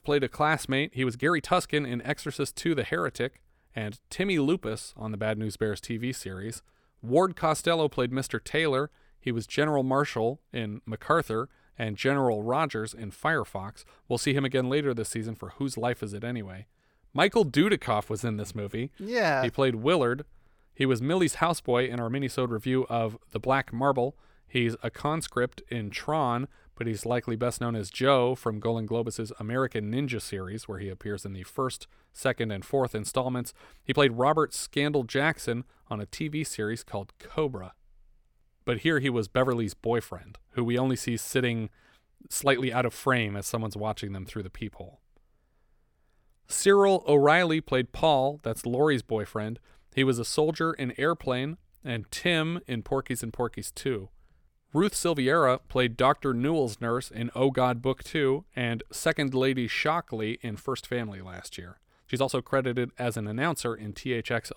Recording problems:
uneven, jittery; strongly; from 1 s to 1:02

